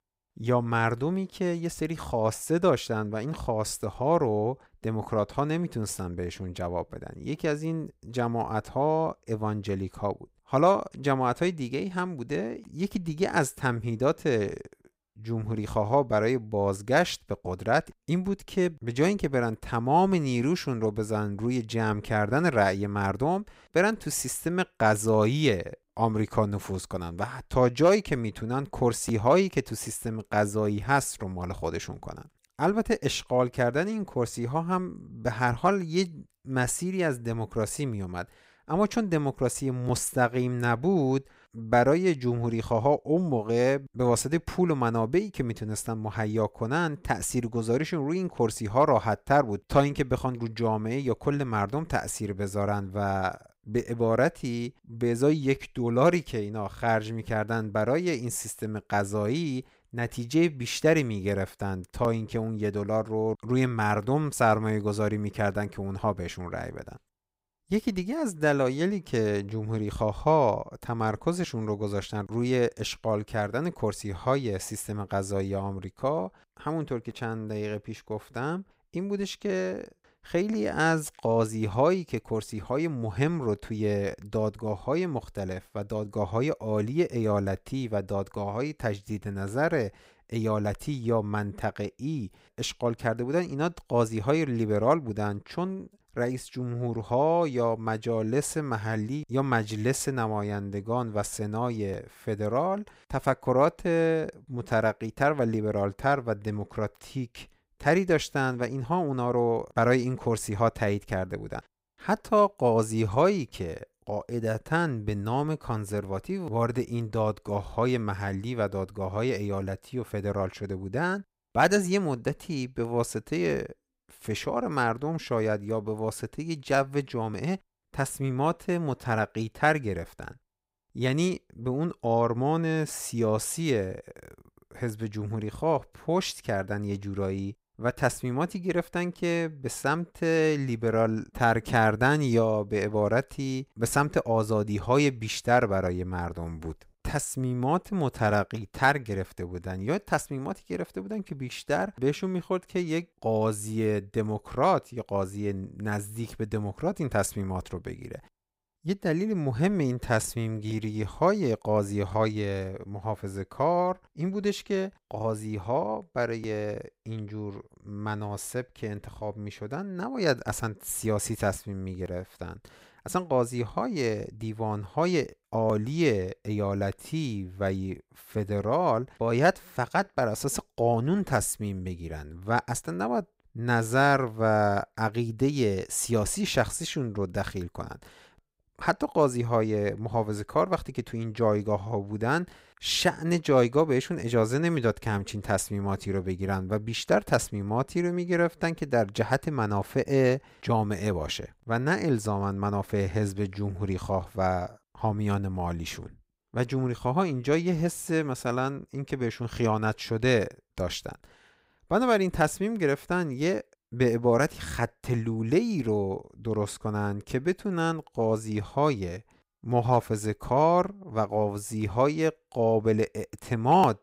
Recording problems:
none

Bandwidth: 15.5 kHz